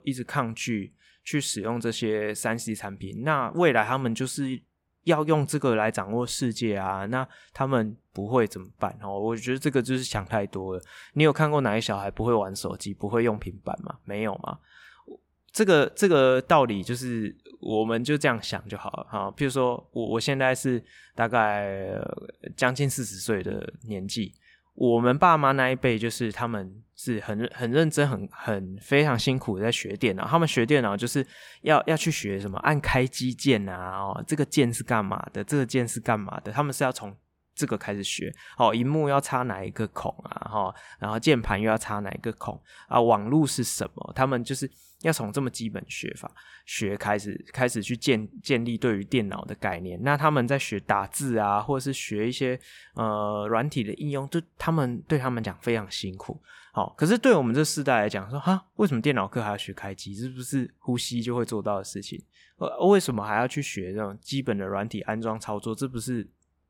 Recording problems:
none

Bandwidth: 17 kHz